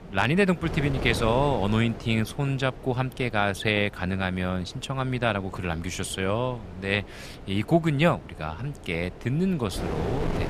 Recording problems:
wind noise on the microphone; occasional gusts; 15 dB below the speech

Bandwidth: 14.5 kHz